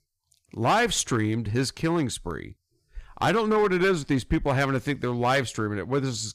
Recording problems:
distortion; slight; 5% of the sound clipped

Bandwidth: 15 kHz